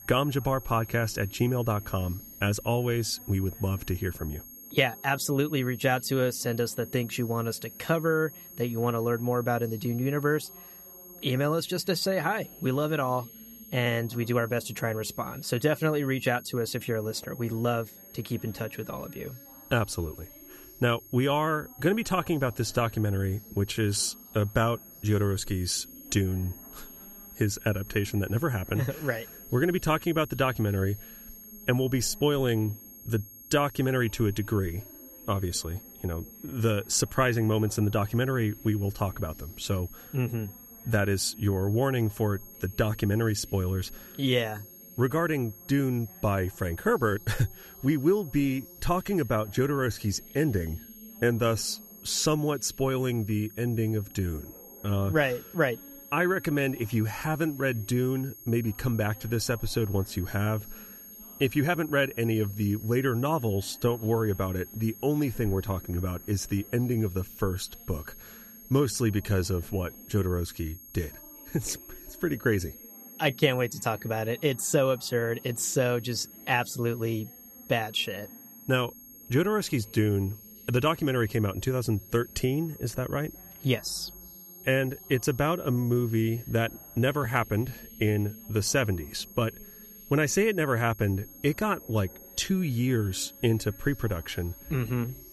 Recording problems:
high-pitched whine; noticeable; throughout; 11.5 kHz, 15 dB below the speech
voice in the background; faint; throughout; 25 dB below the speech

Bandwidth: 14.5 kHz